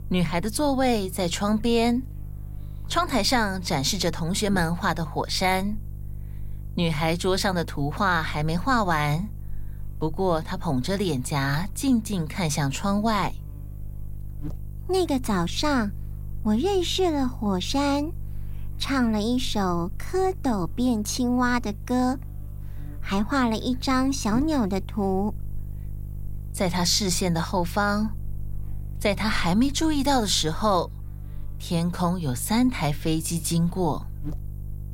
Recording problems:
electrical hum; faint; throughout; 50 Hz, 25 dB below the speech

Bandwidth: 16 kHz